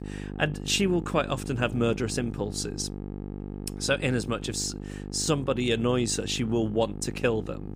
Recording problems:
electrical hum; noticeable; throughout; 50 Hz, 15 dB below the speech

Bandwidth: 15.5 kHz